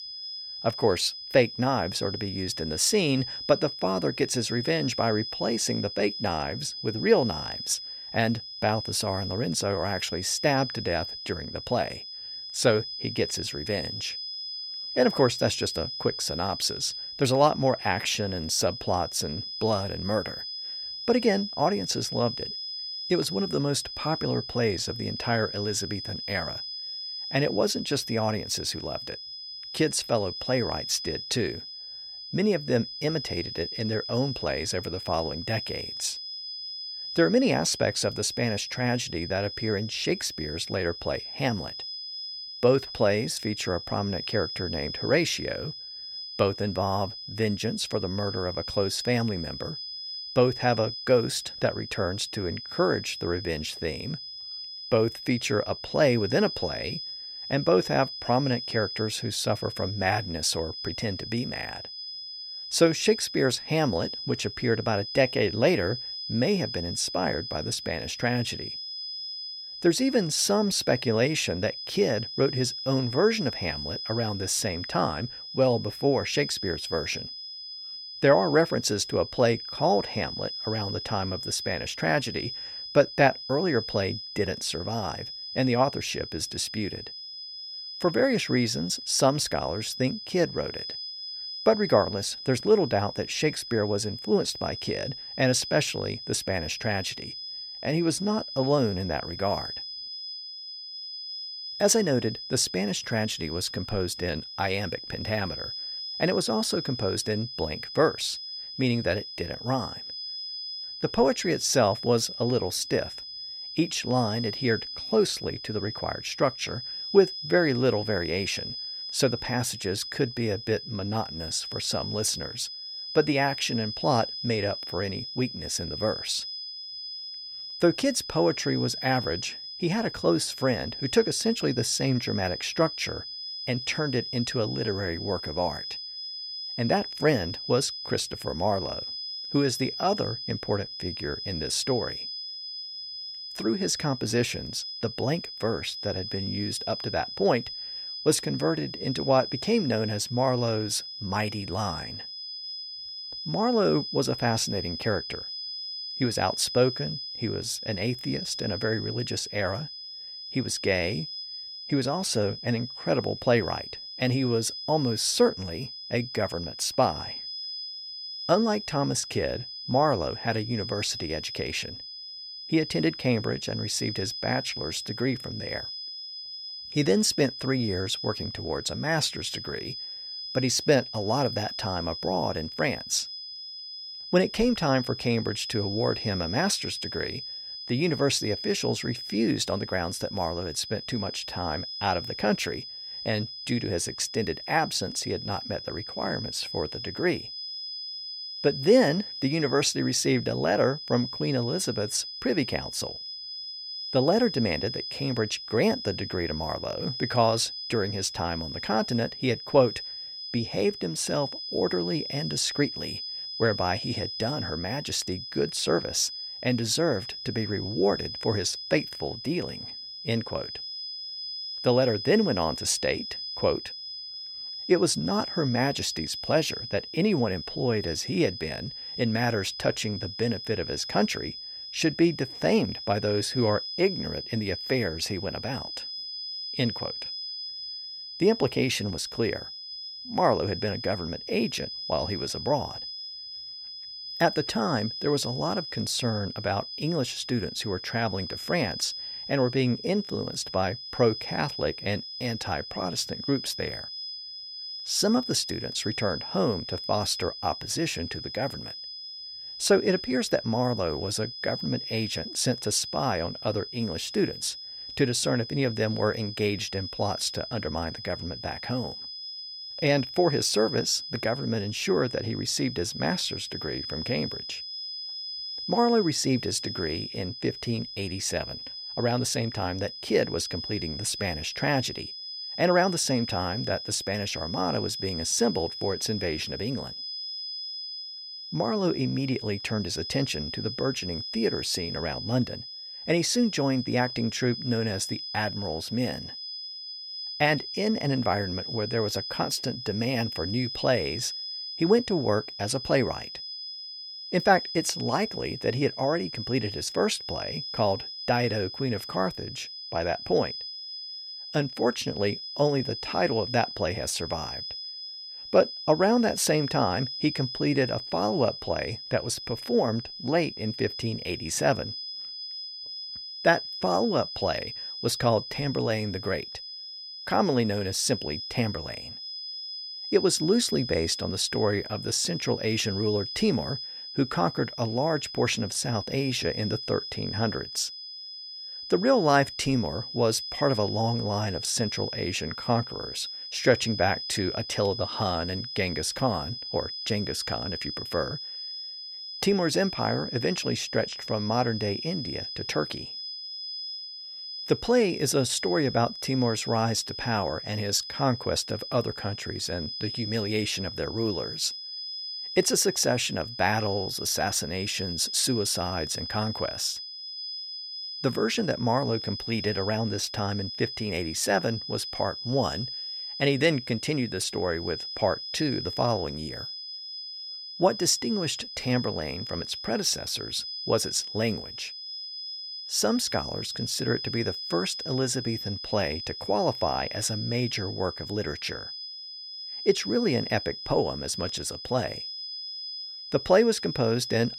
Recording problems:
high-pitched whine; loud; throughout; 5 kHz, 7 dB below the speech

